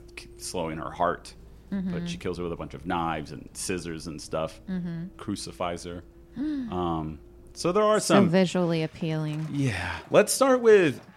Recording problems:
traffic noise; faint; throughout; 25 dB below the speech

